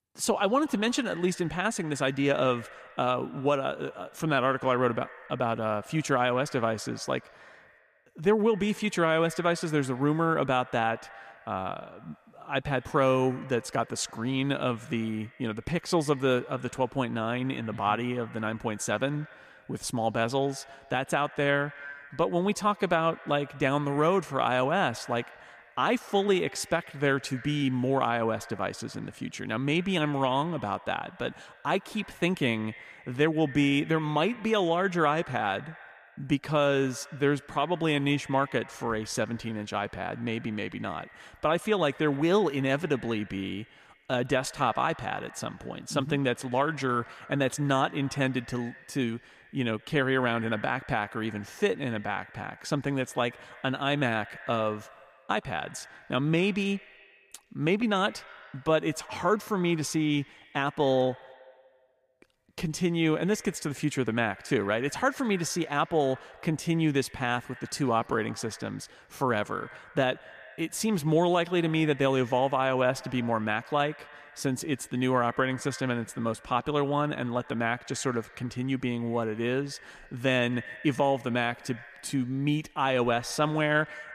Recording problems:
echo of what is said; faint; throughout; 120 ms later, 20 dB below the speech

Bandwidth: 14.5 kHz